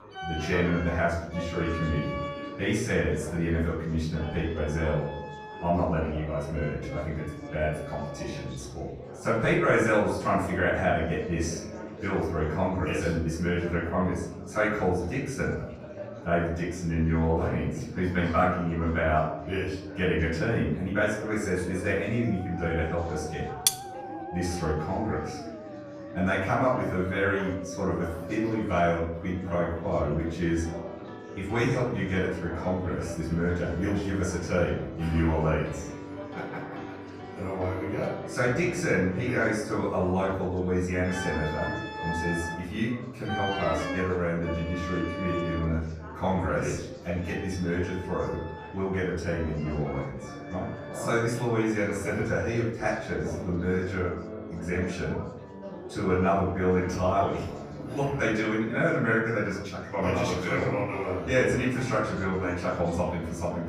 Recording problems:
off-mic speech; far
room echo; noticeable; dies away in 0.7 s
background music; noticeable; throughout; 10 dB below the speech
chatter from many people; noticeable; throughout; 15 dB below the speech
clattering dishes; loud; at 24 s; peak 3 dB above the speech

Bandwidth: 15 kHz